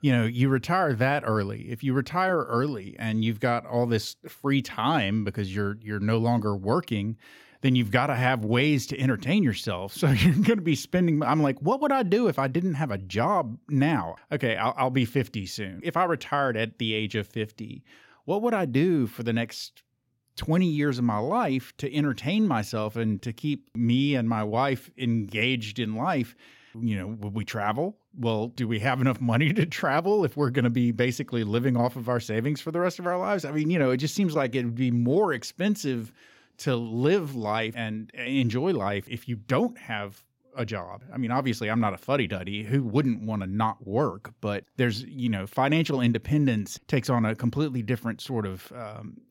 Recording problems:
none

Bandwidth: 16.5 kHz